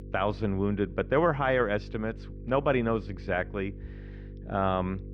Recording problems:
muffled; very; fading above 2 kHz
electrical hum; faint; throughout; 50 Hz, 25 dB below the speech

